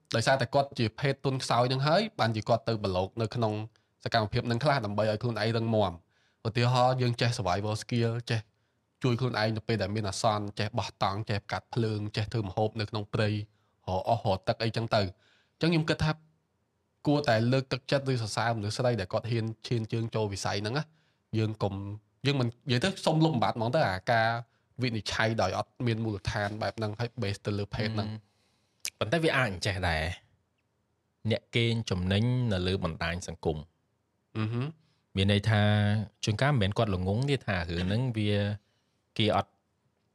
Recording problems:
none

